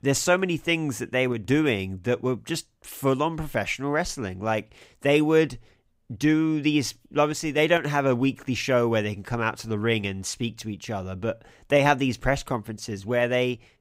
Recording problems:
none

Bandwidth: 15.5 kHz